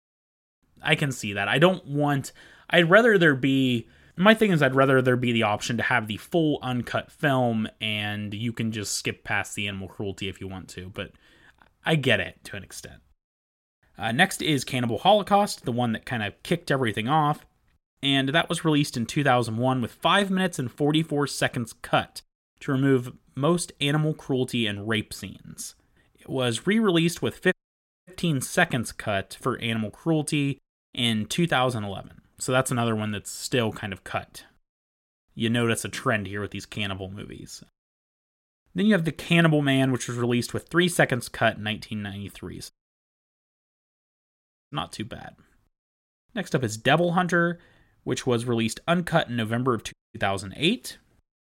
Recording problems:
audio cutting out; at 28 s for 0.5 s, at 43 s for 2 s and at 50 s

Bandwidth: 16 kHz